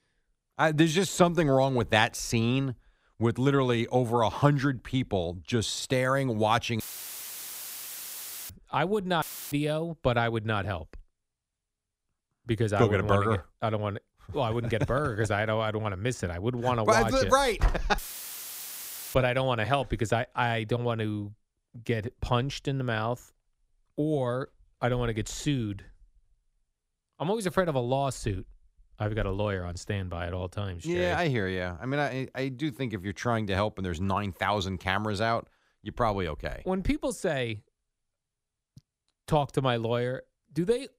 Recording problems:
audio cutting out; filled with static; at 7 s for 1.5 s, at 9 s and at 18 s for 1 s

